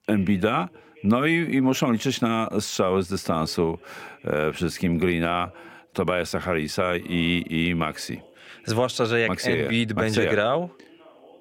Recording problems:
voice in the background; faint; throughout; 25 dB below the speech

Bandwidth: 16.5 kHz